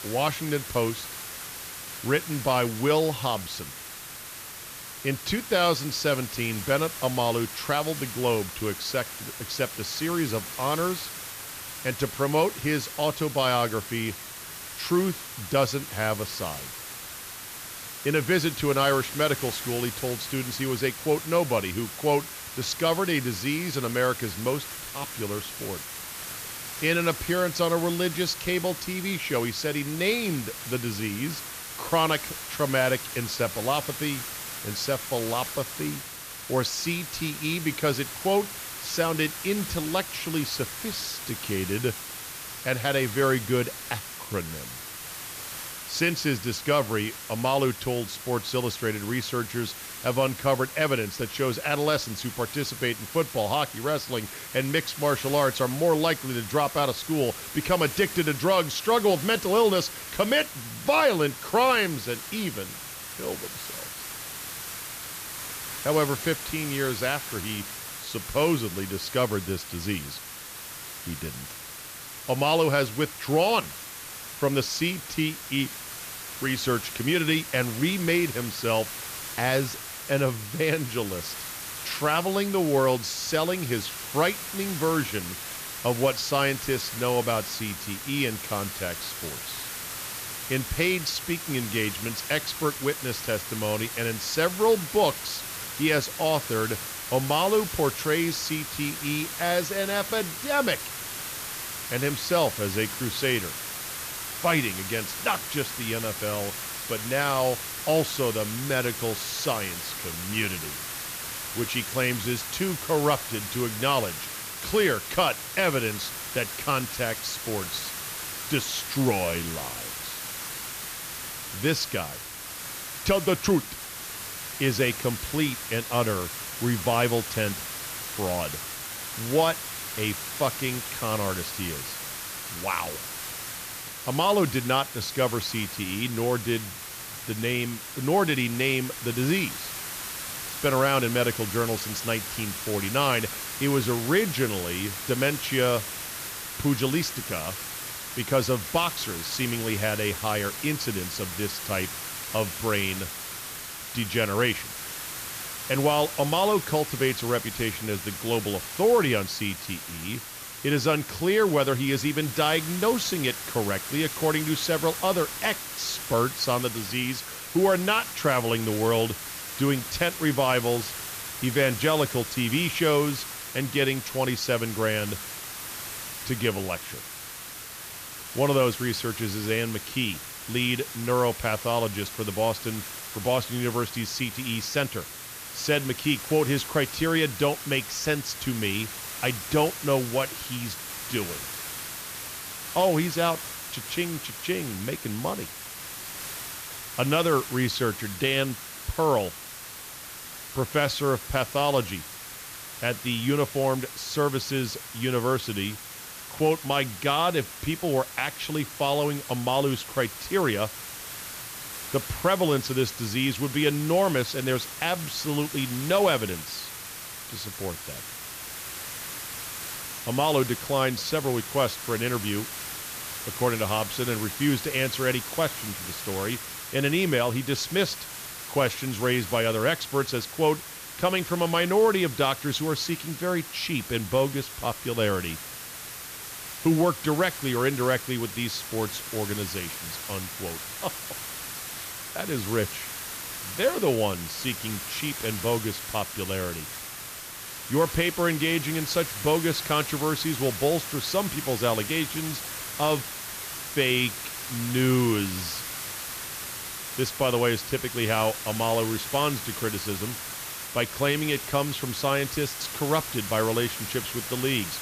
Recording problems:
hiss; loud; throughout; 7 dB below the speech

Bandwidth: 14.5 kHz